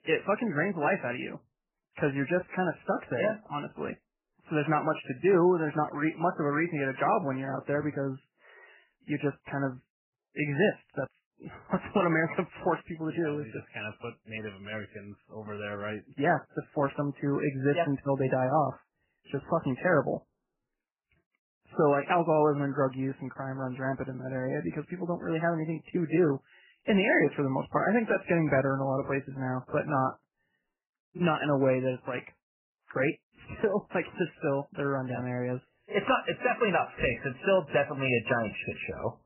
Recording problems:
garbled, watery; badly; nothing above 3 kHz

